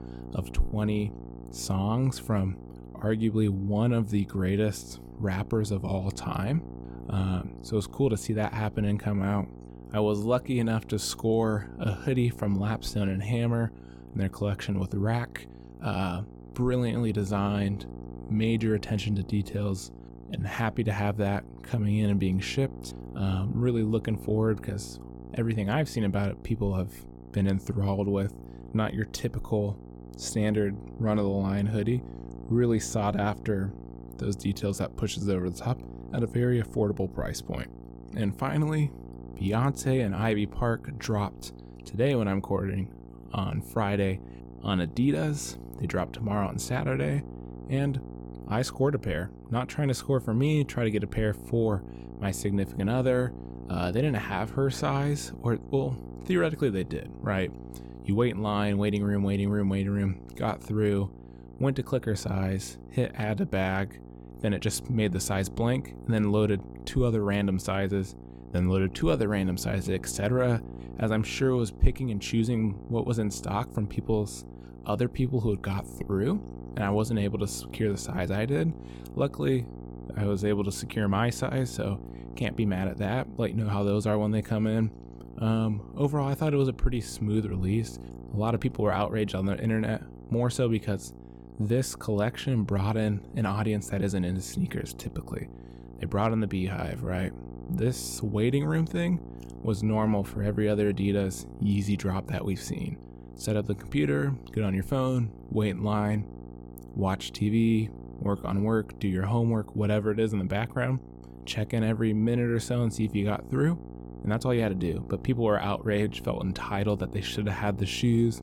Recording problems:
electrical hum; noticeable; throughout; 60 Hz, 15 dB below the speech

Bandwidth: 17.5 kHz